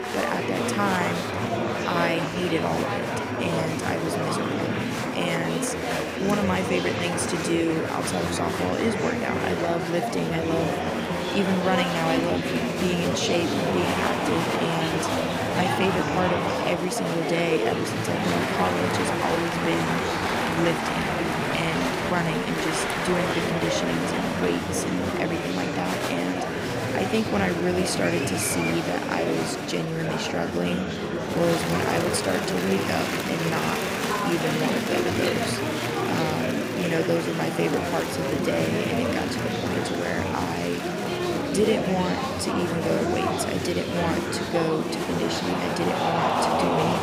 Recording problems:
murmuring crowd; very loud; throughout; 1 dB above the speech
high-pitched whine; faint; throughout; 5.5 kHz, 30 dB below the speech

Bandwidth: 15.5 kHz